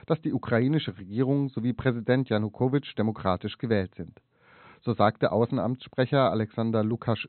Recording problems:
high frequencies cut off; severe; nothing above 4 kHz

